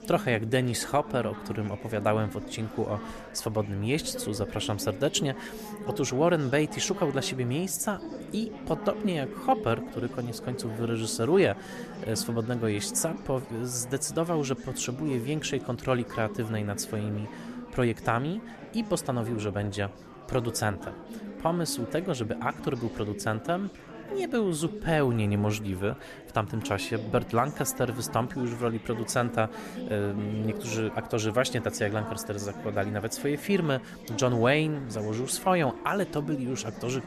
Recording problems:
chatter from many people; noticeable; throughout; 10 dB below the speech

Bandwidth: 13.5 kHz